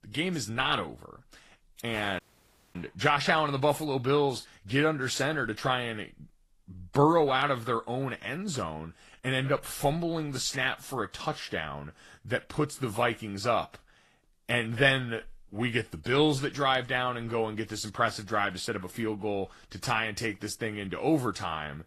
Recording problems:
garbled, watery; slightly; nothing above 12.5 kHz
audio cutting out; at 2 s for 0.5 s

